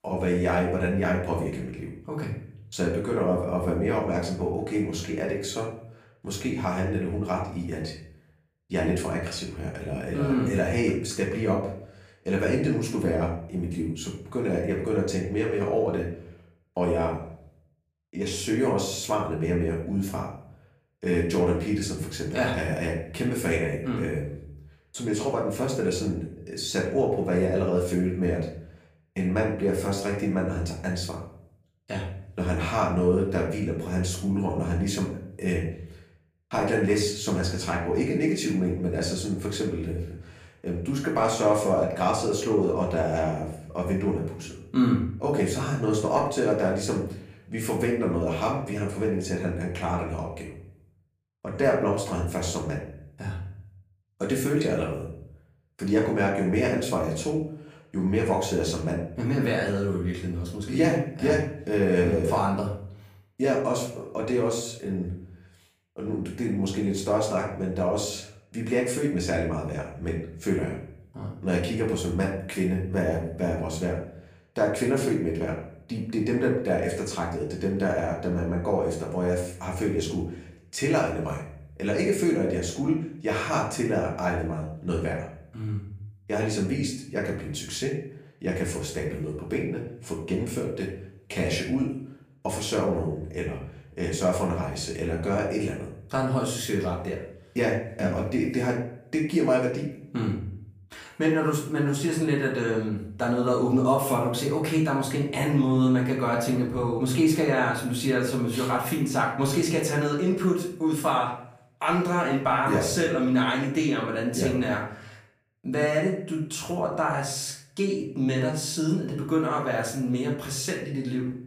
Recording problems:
off-mic speech; far
room echo; slight; dies away in 0.5 s

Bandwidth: 15 kHz